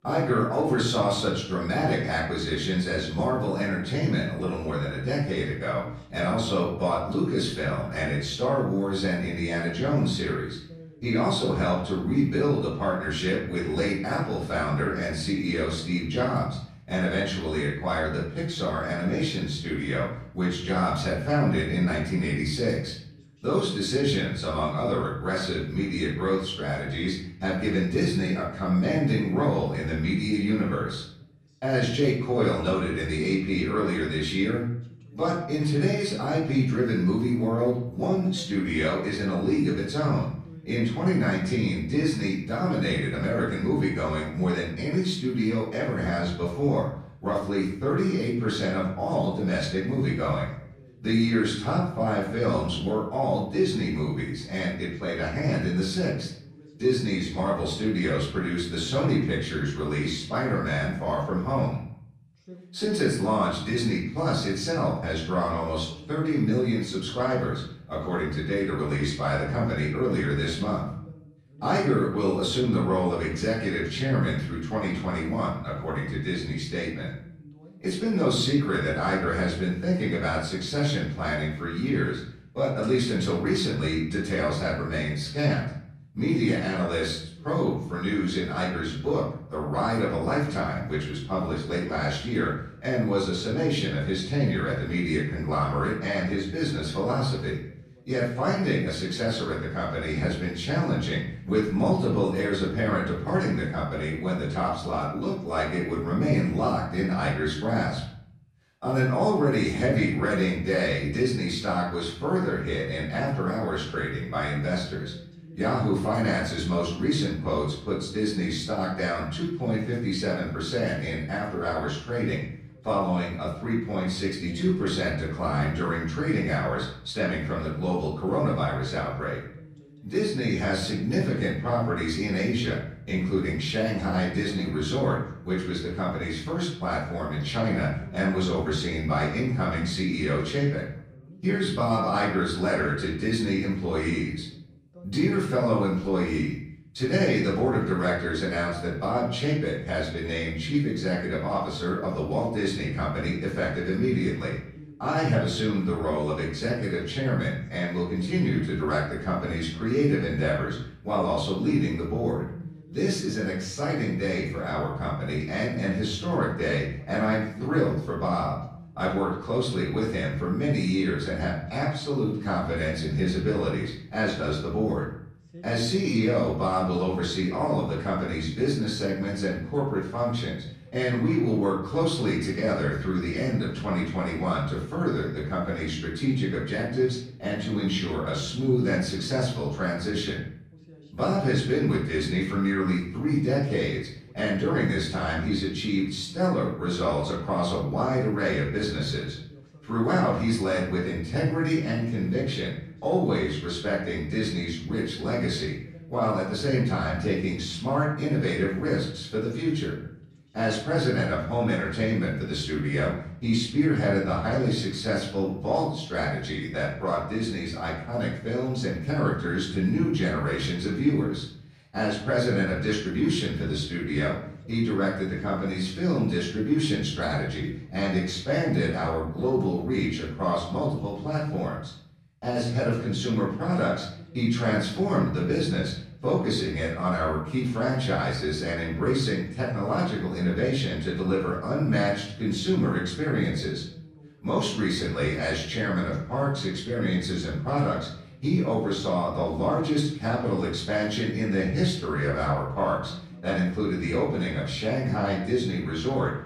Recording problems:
off-mic speech; far
room echo; noticeable; dies away in 0.7 s
voice in the background; faint; throughout; 20 dB below the speech

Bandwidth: 15 kHz